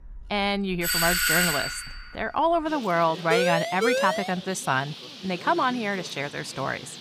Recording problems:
animal sounds; noticeable; throughout; 15 dB below the speech
doorbell; loud; from 1 to 2 s; peak 5 dB above the speech
siren; loud; from 3.5 to 4.5 s; peak 1 dB above the speech

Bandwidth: 15.5 kHz